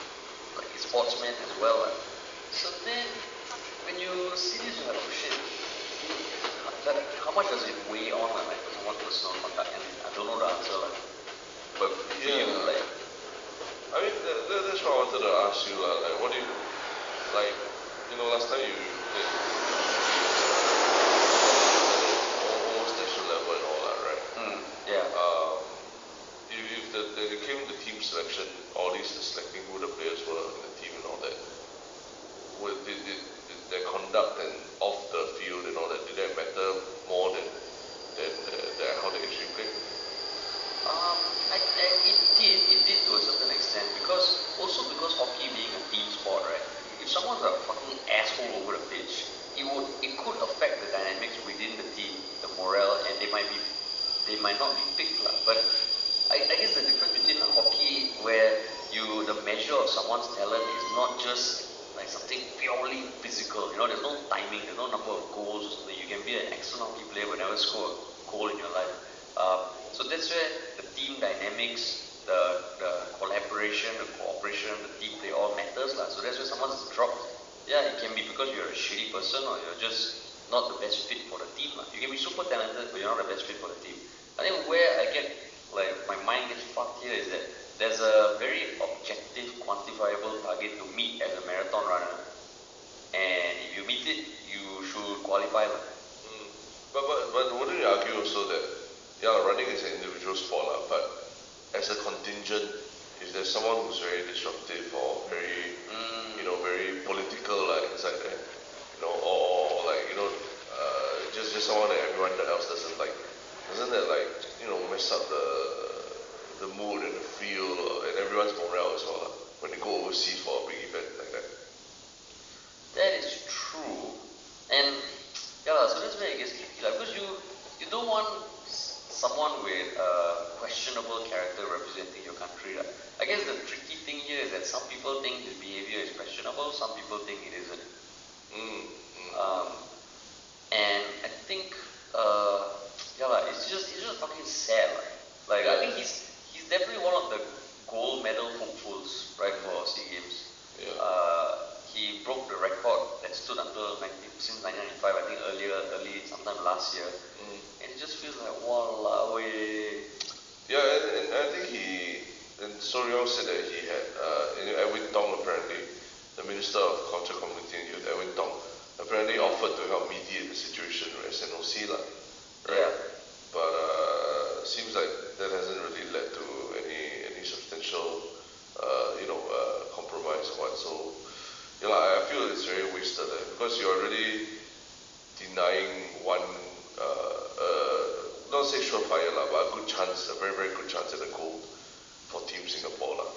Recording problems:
thin; very; fading below 400 Hz
room echo; noticeable; dies away in 1 s
high frequencies cut off; noticeable; nothing above 7 kHz
off-mic speech; somewhat distant
train or aircraft noise; very loud; throughout; 2 dB above the speech
hiss; noticeable; throughout; 15 dB below the speech

